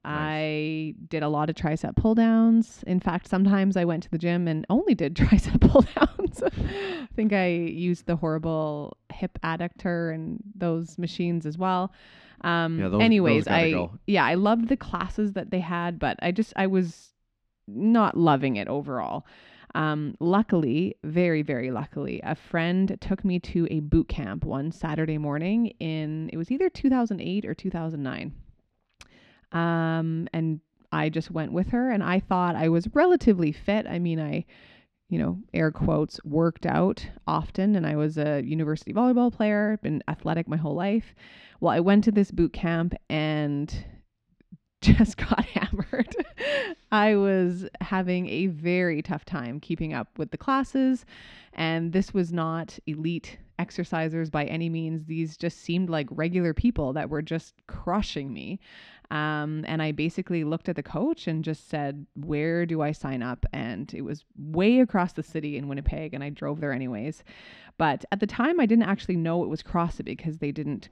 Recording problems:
muffled; slightly; fading above 3 kHz

